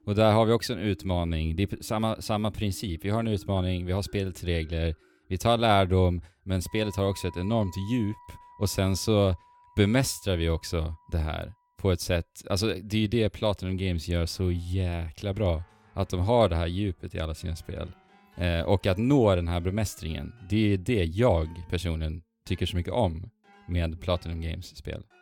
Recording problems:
background music; faint; throughout; 25 dB below the speech

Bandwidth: 17 kHz